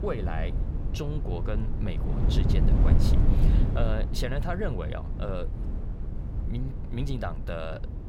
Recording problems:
wind noise on the microphone; heavy; 4 dB below the speech

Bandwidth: 16 kHz